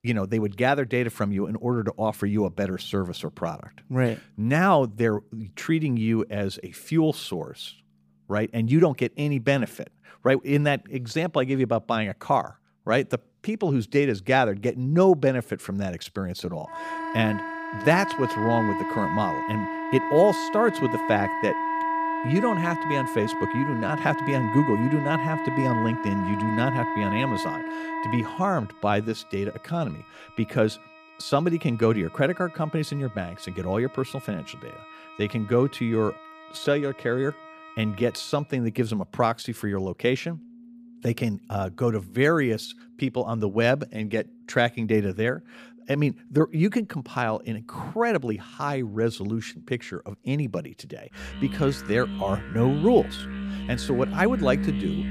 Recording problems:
background music; loud; throughout; 5 dB below the speech

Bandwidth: 15 kHz